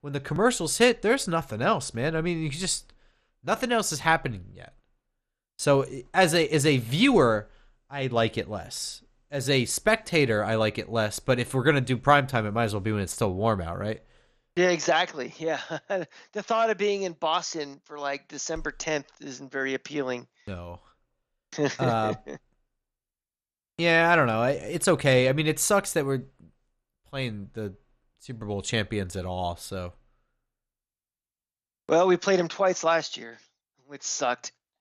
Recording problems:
none

